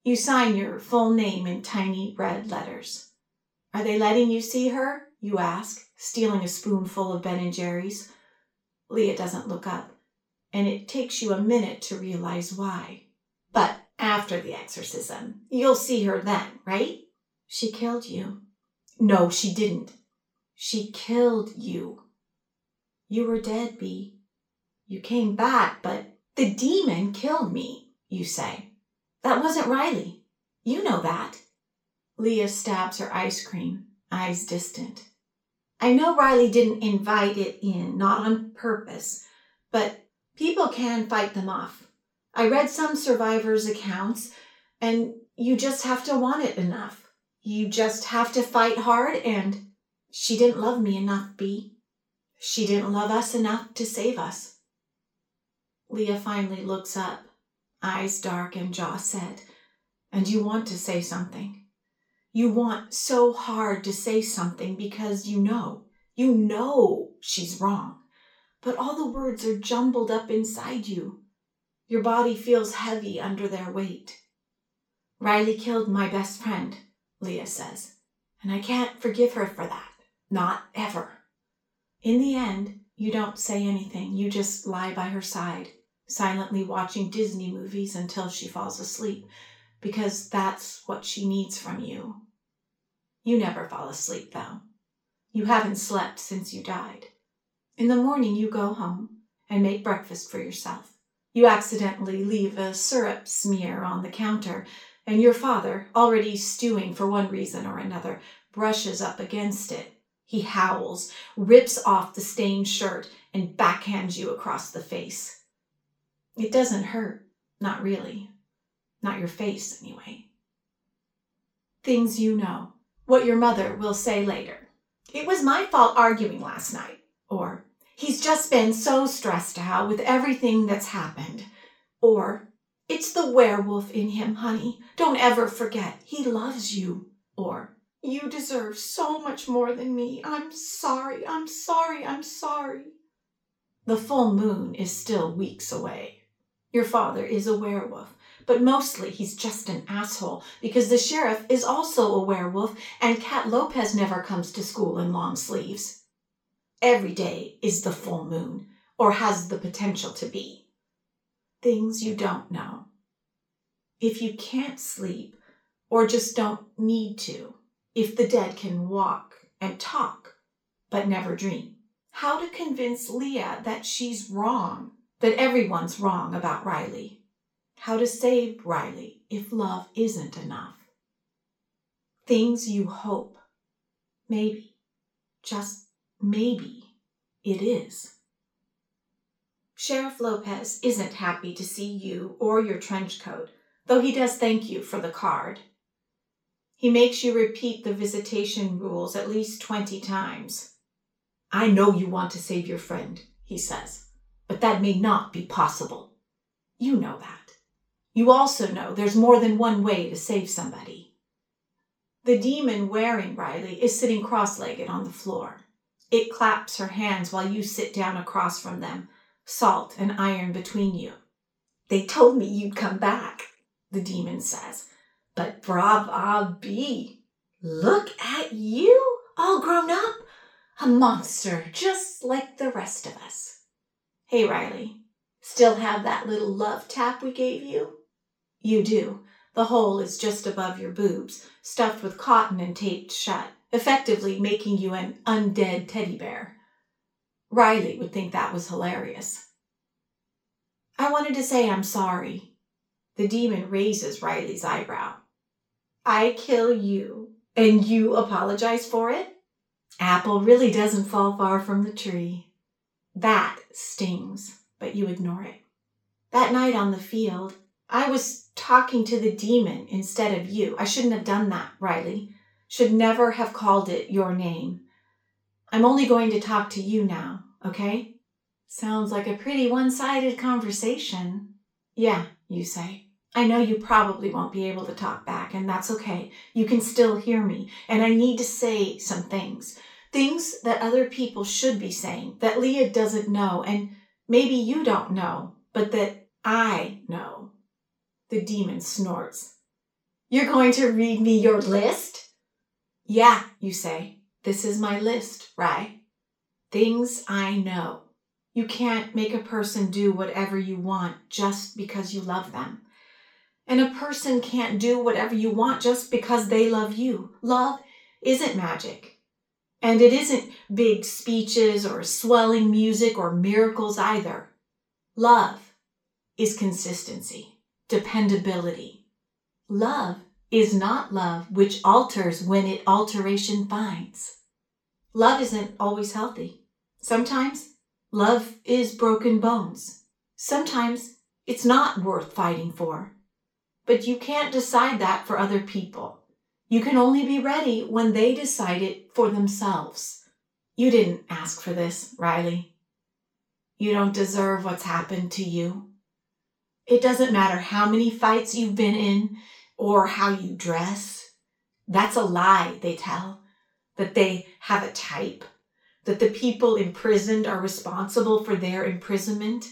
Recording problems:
off-mic speech; far
room echo; slight; dies away in 0.3 s

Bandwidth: 18 kHz